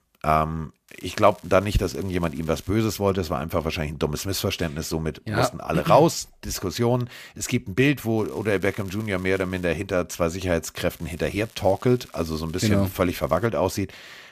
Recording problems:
crackling; faint; from 1 to 2.5 s, from 8 to 9.5 s and from 11 to 13 s; 25 dB below the speech

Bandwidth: 14.5 kHz